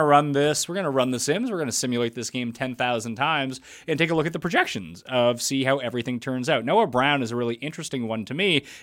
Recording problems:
abrupt cut into speech; at the start

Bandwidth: 16 kHz